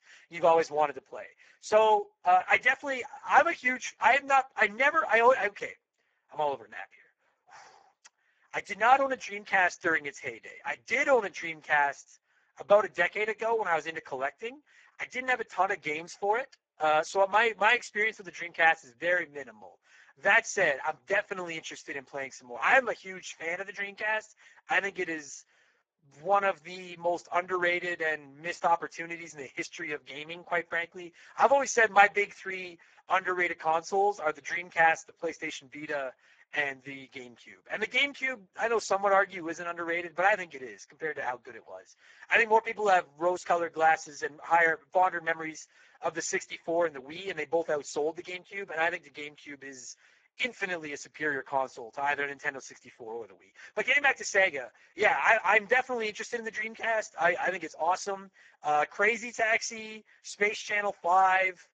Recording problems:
garbled, watery; badly; nothing above 7.5 kHz
thin; very; fading below 500 Hz

